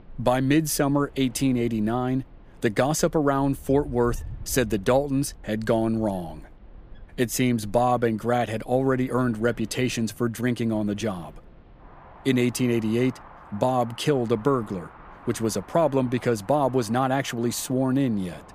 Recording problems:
wind in the background; faint; throughout; 20 dB below the speech

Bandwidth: 15 kHz